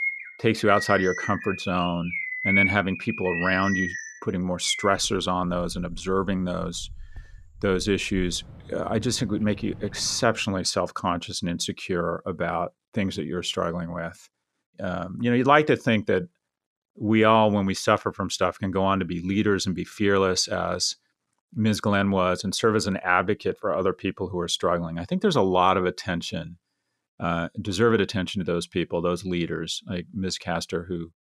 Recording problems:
animal sounds; loud; until 10 s; 3 dB below the speech

